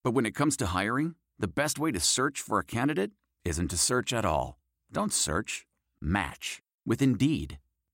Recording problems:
none

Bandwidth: 16 kHz